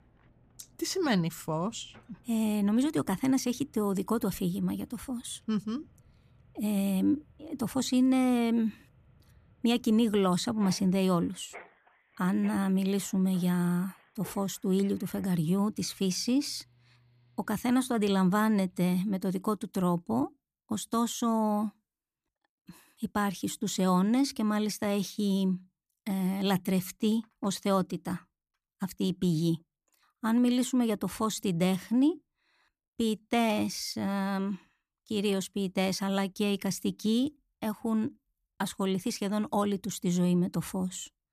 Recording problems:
machinery noise; faint; until 19 s; 30 dB below the speech

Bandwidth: 14.5 kHz